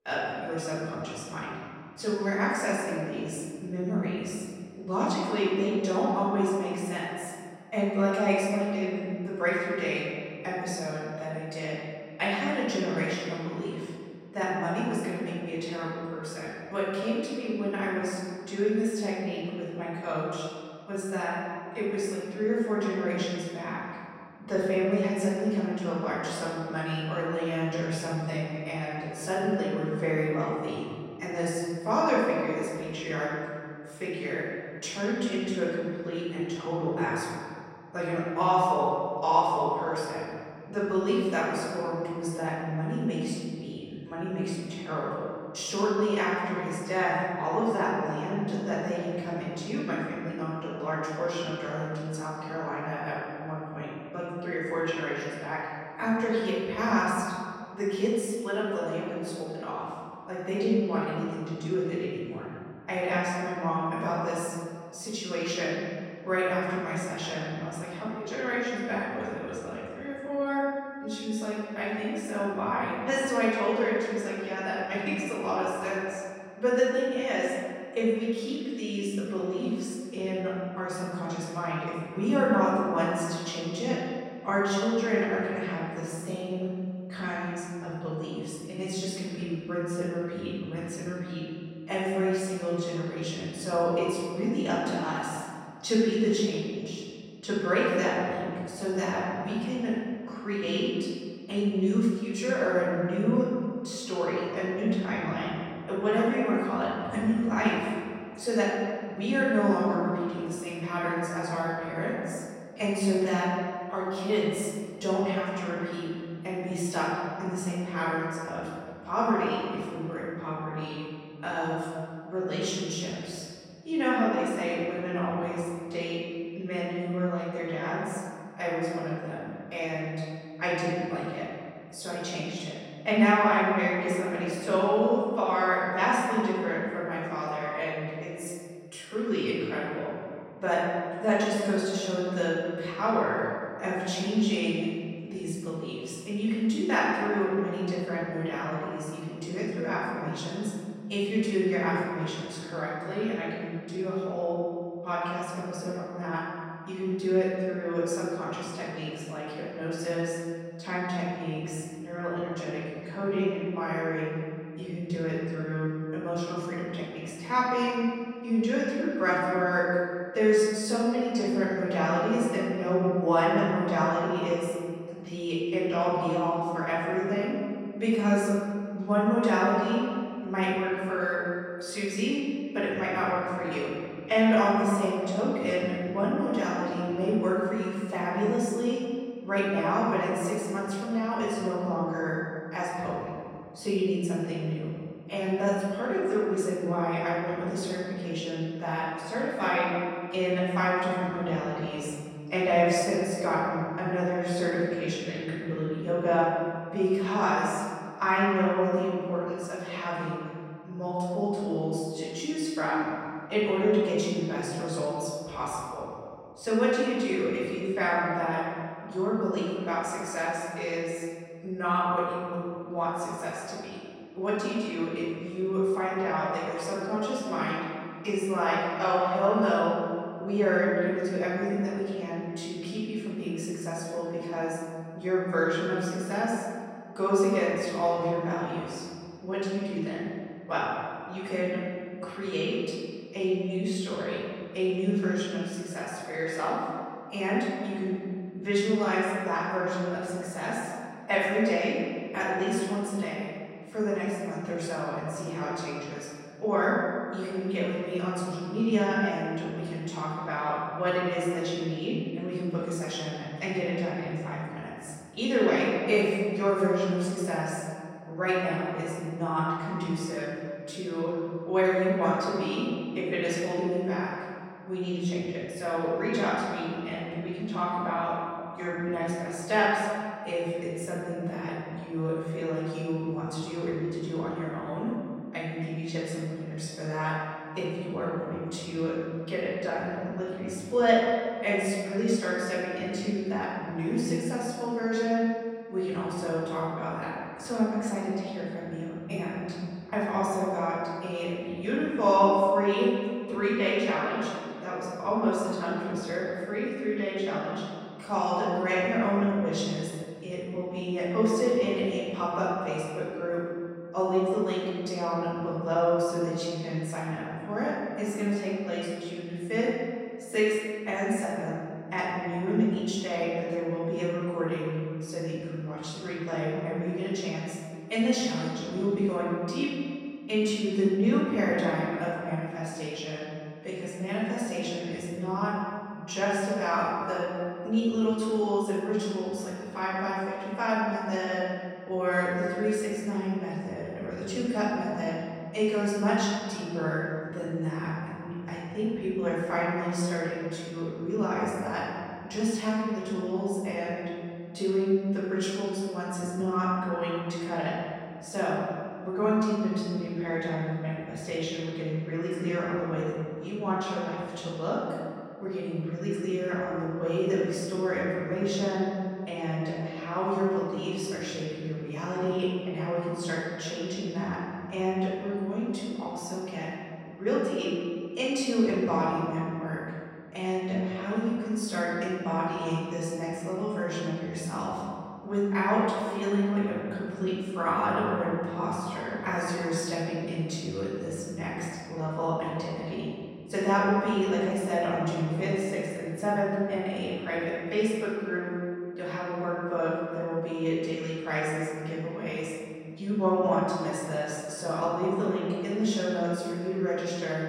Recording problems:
room echo; strong; dies away in 2 s
off-mic speech; far

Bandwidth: 16 kHz